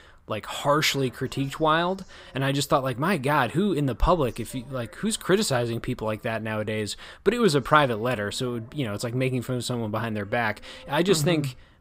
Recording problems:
voice in the background; faint; throughout; 30 dB below the speech

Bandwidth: 15.5 kHz